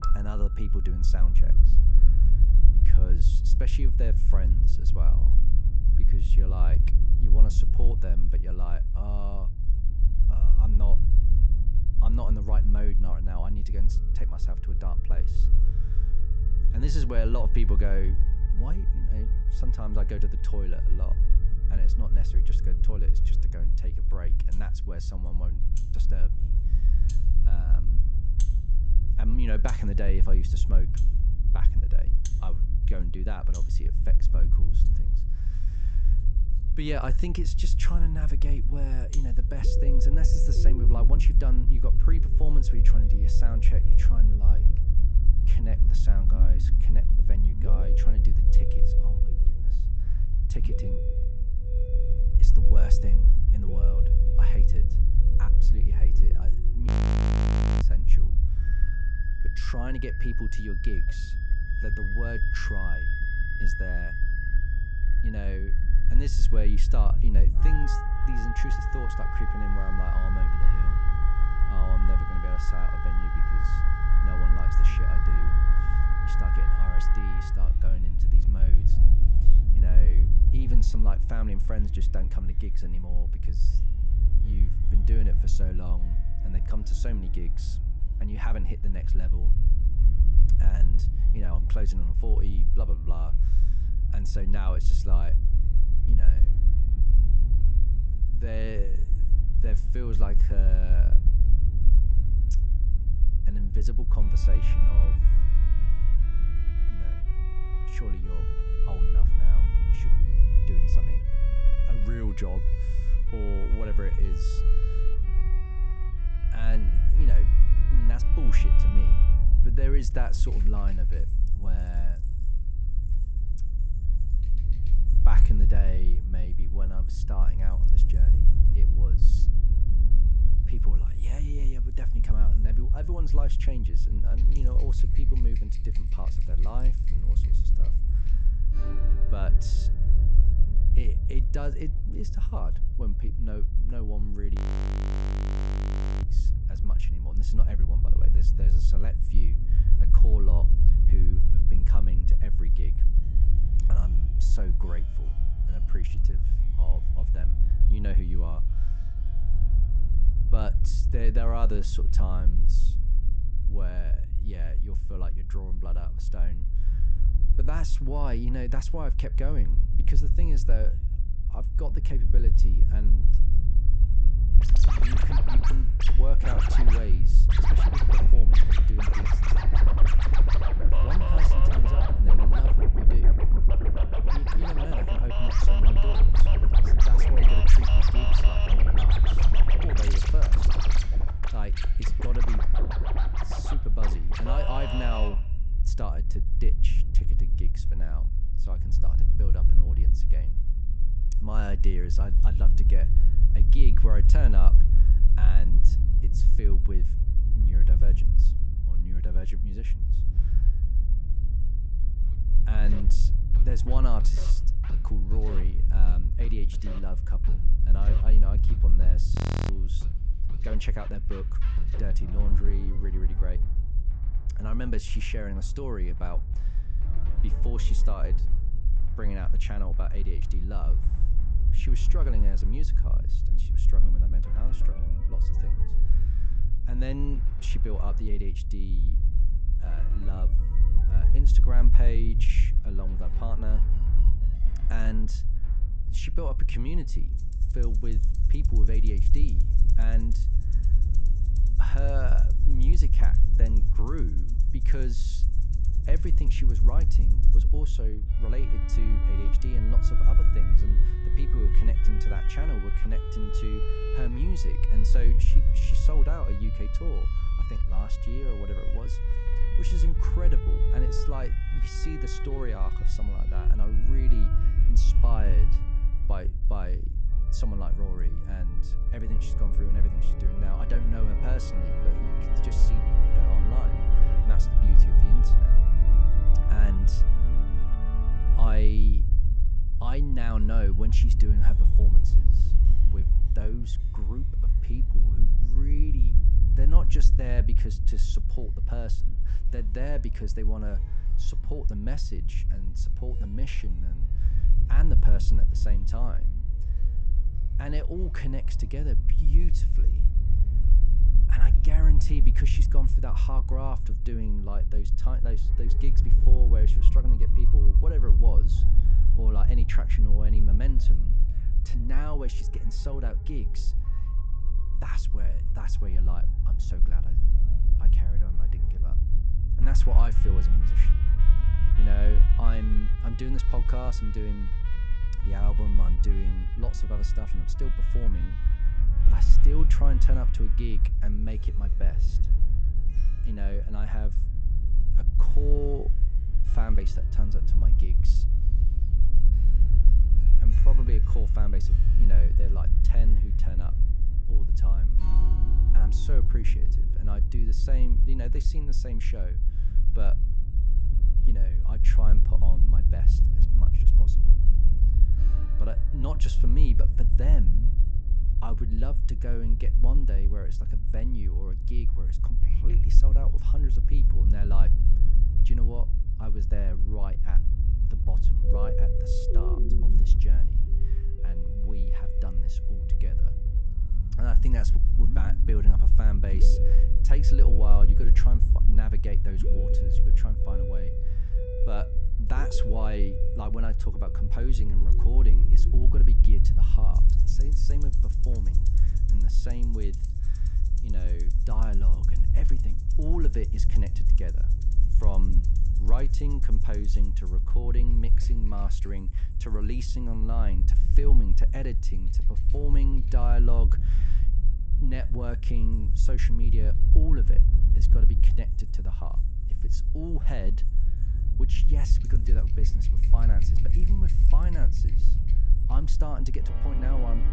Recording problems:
high frequencies cut off; noticeable; nothing above 8 kHz
background music; loud; throughout; 3 dB below the speech
low rumble; loud; throughout; 5 dB below the speech
audio freezing; at 57 s for 1 s, at 2:25 for 1.5 s and at 3:39

